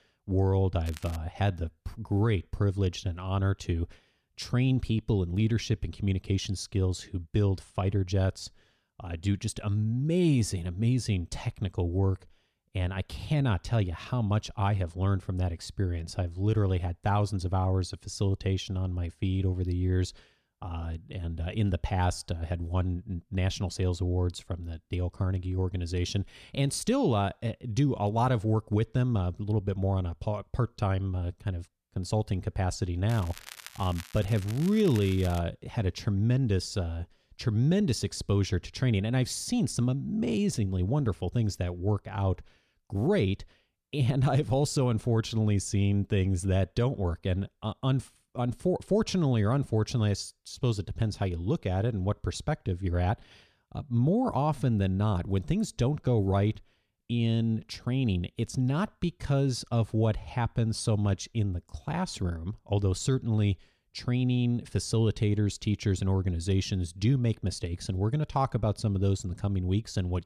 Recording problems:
crackling; noticeable; at 1 s and from 33 to 35 s; 15 dB below the speech

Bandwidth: 14 kHz